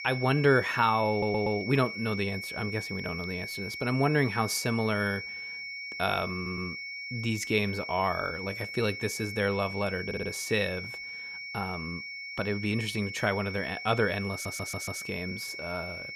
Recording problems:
high-pitched whine; loud; throughout; 2 kHz, 7 dB below the speech
audio stuttering; 4 times, first at 1 s

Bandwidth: 14.5 kHz